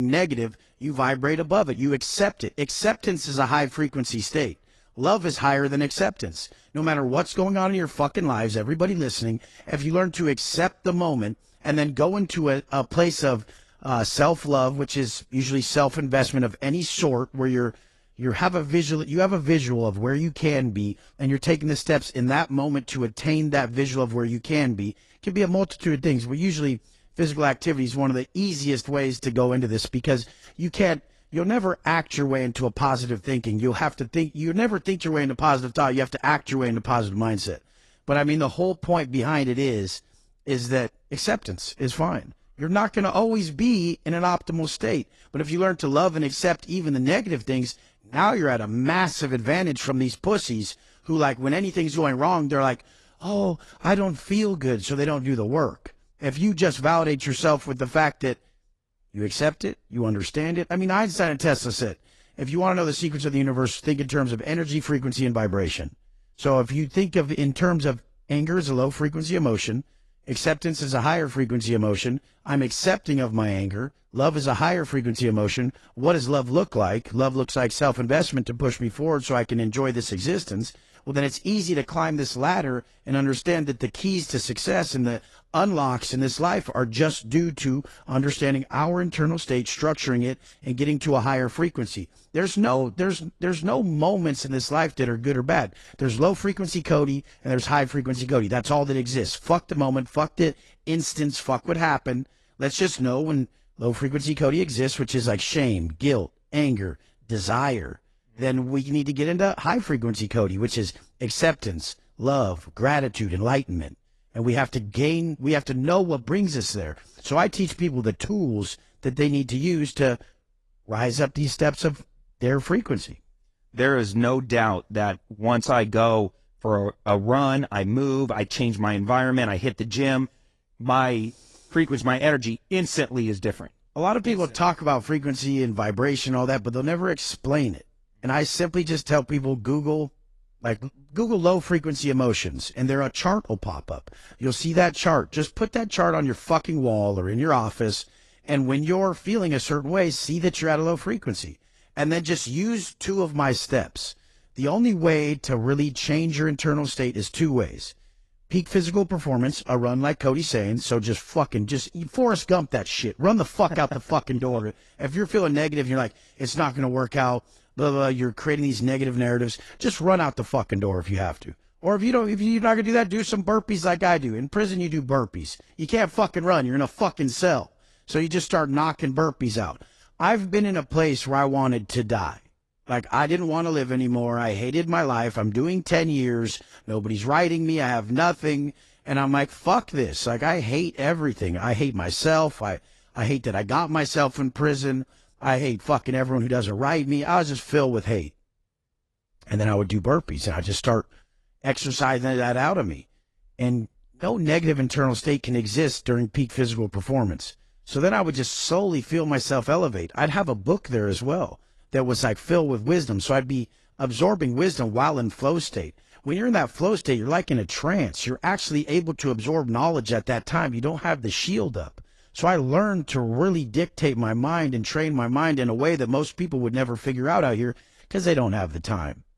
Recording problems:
garbled, watery; slightly; nothing above 11 kHz
abrupt cut into speech; at the start

